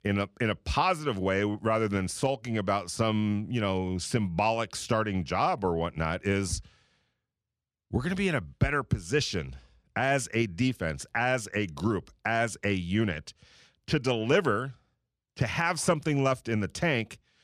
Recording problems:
none

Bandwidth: 14 kHz